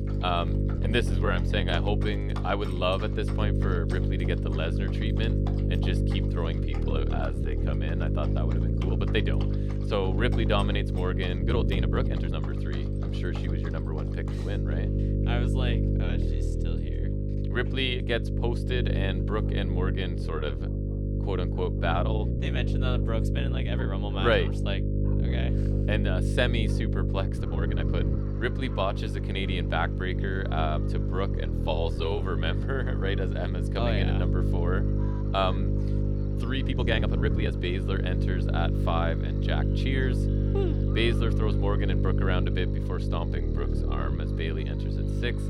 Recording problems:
electrical hum; loud; throughout; 50 Hz, 5 dB below the speech
animal sounds; noticeable; throughout; 20 dB below the speech
uneven, jittery; strongly; from 0.5 to 44 s

